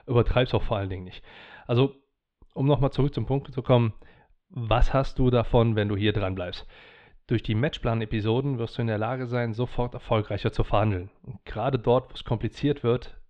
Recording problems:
muffled; slightly; fading above 3.5 kHz

